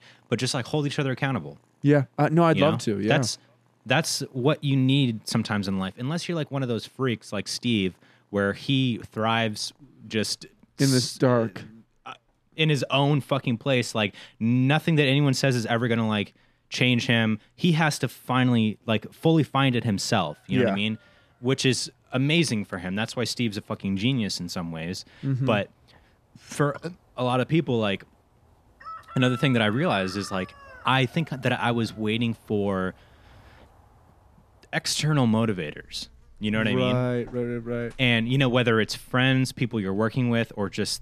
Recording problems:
animal sounds; faint; throughout; 25 dB below the speech

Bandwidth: 14 kHz